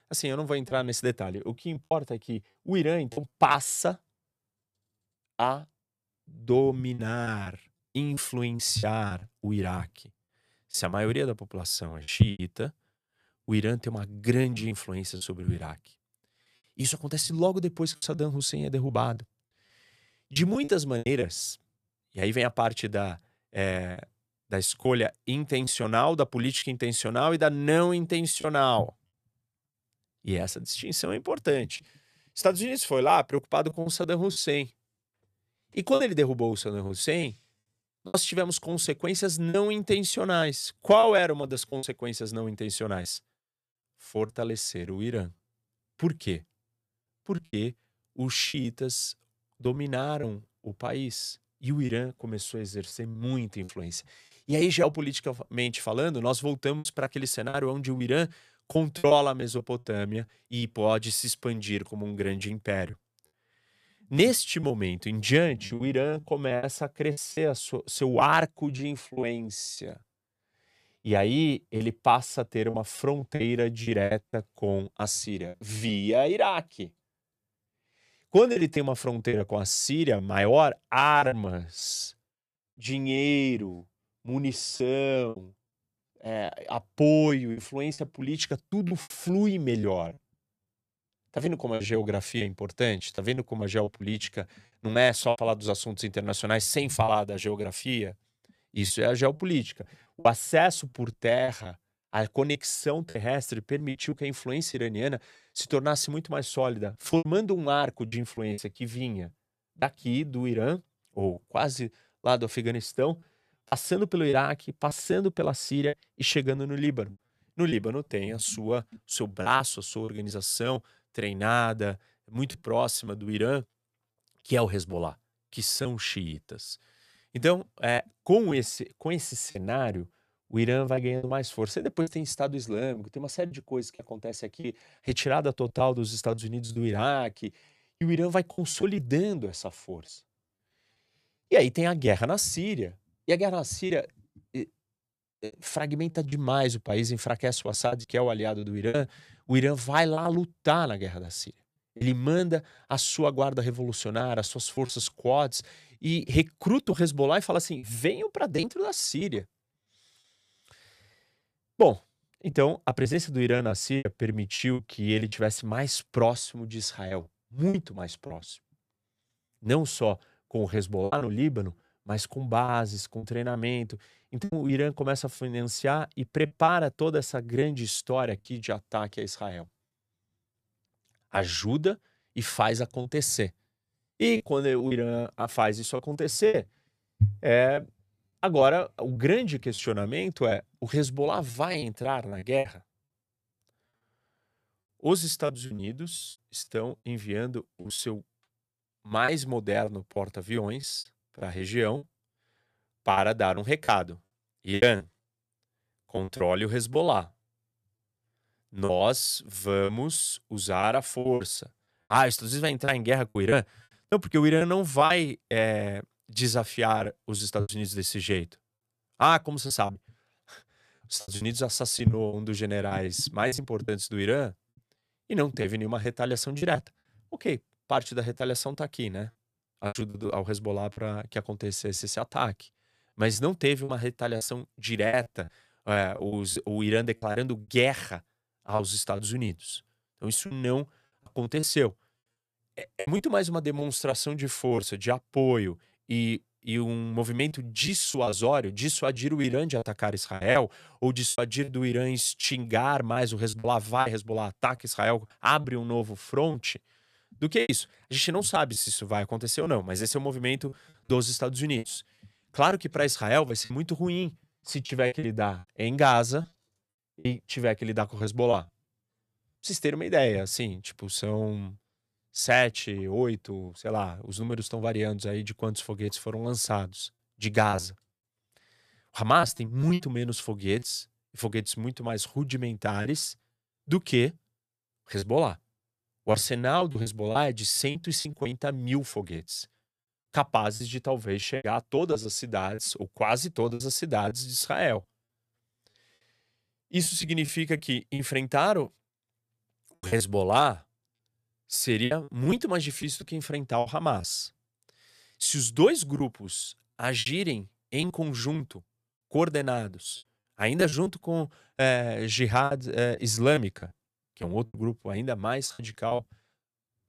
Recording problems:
choppy; very; 7% of the speech affected

